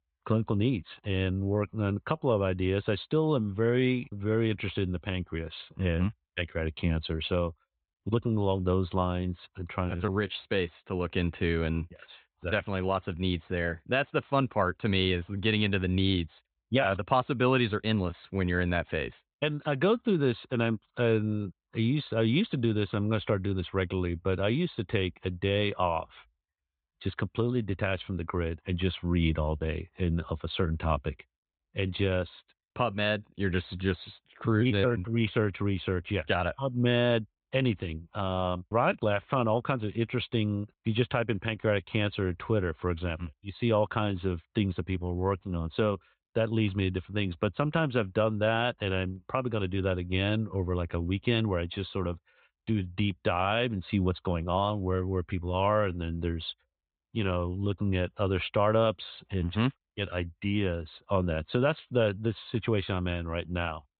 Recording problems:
high frequencies cut off; severe; nothing above 4 kHz

